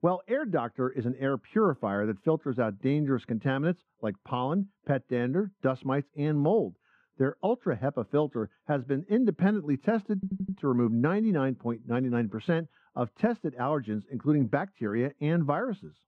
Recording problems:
muffled; very; fading above 3 kHz
audio stuttering; at 10 s

